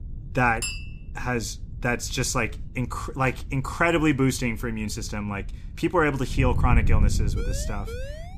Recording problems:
wind noise on the microphone; occasional gusts; 20 dB below the speech
clattering dishes; noticeable; at 0.5 s; peak 5 dB below the speech
siren; faint; from 7.5 s on; peak 15 dB below the speech

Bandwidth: 14.5 kHz